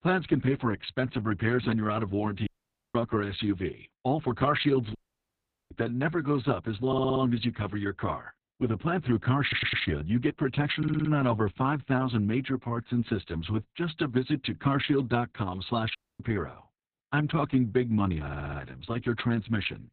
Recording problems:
garbled, watery; badly; nothing above 4 kHz
audio cutting out; at 2.5 s, at 5 s for 1 s and at 16 s
audio stuttering; 4 times, first at 7 s

